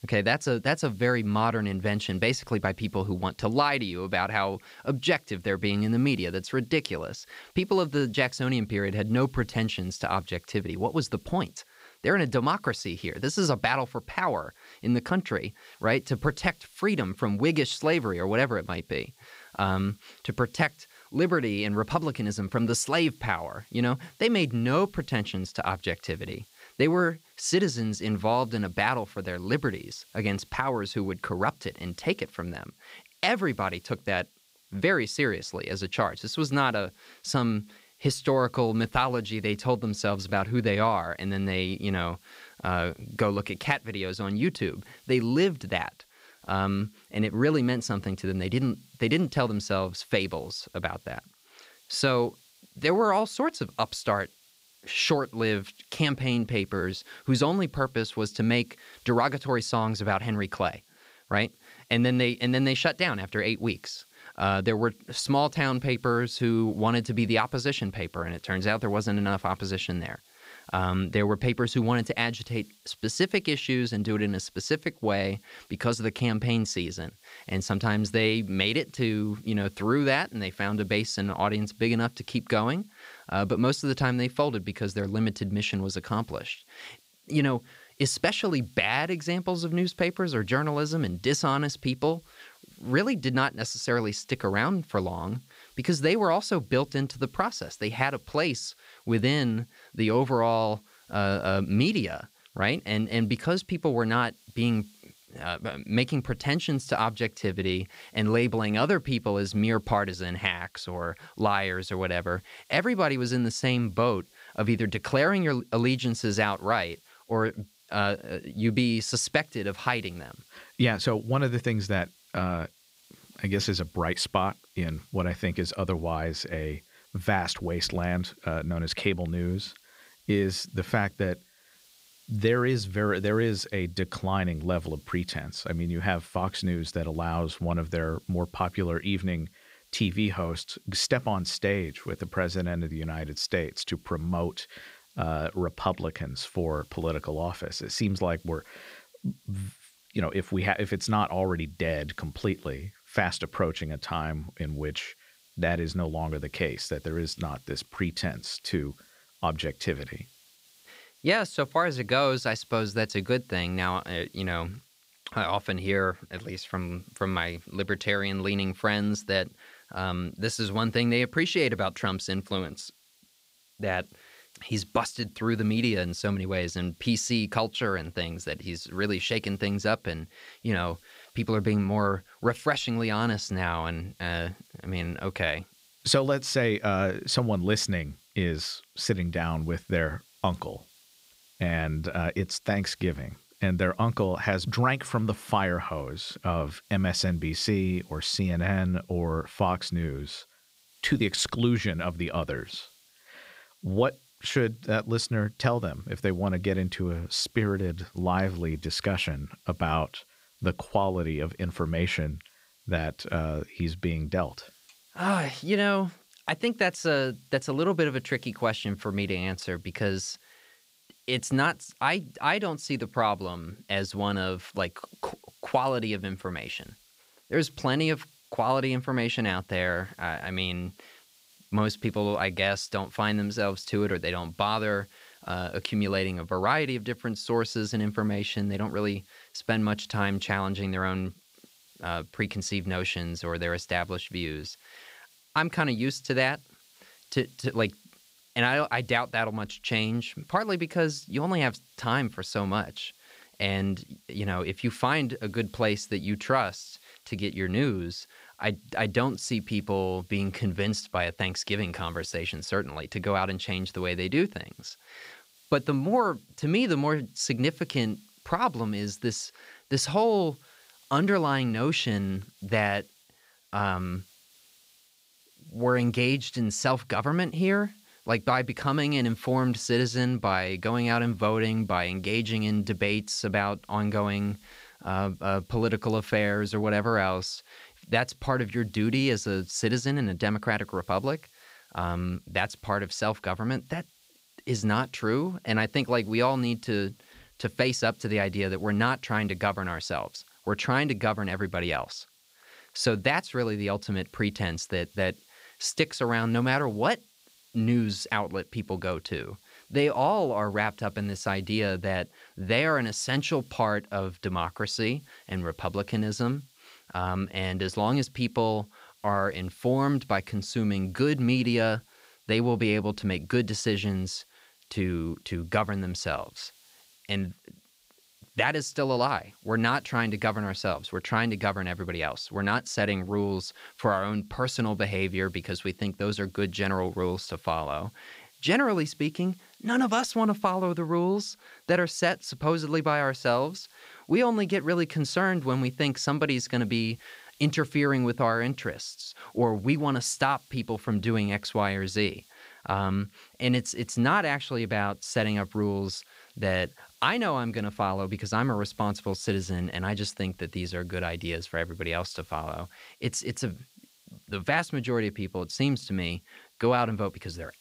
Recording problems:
hiss; faint; throughout; 30 dB below the speech

